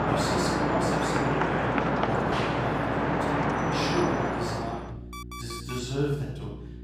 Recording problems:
off-mic speech; far
room echo; noticeable; dies away in 0.7 s
traffic noise; very loud; until 4.5 s; 6 dB above the speech
electrical hum; noticeable; throughout; 60 Hz, 15 dB below the speech
alarm; noticeable; at 5 s; peak 8 dB below the speech

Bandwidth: 15.5 kHz